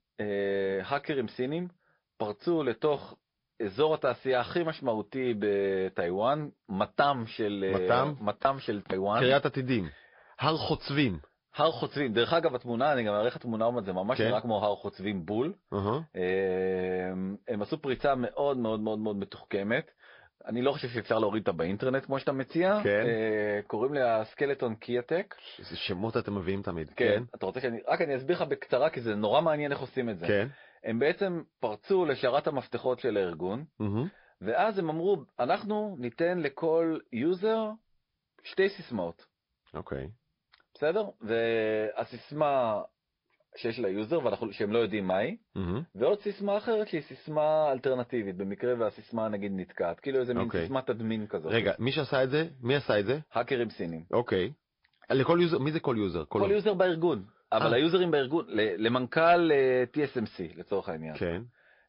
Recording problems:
high frequencies cut off; noticeable; nothing above 5 kHz
garbled, watery; slightly

